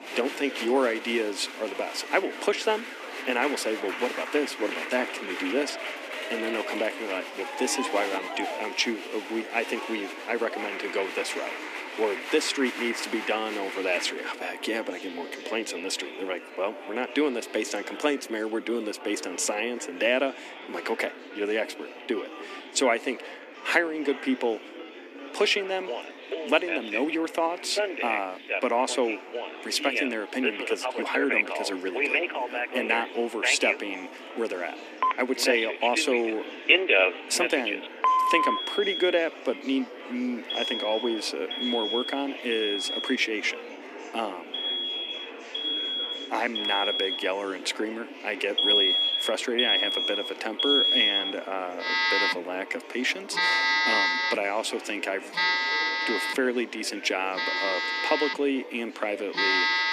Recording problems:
thin; somewhat; fading below 250 Hz
alarms or sirens; very loud; throughout; 3 dB above the speech
murmuring crowd; loud; throughout; 10 dB below the speech

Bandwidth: 14.5 kHz